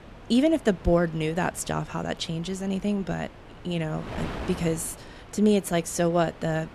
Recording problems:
wind noise on the microphone; occasional gusts; 15 dB below the speech

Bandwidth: 13.5 kHz